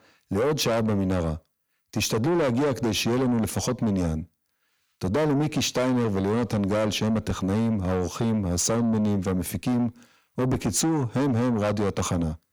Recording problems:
distortion; heavy; 7 dB below the speech

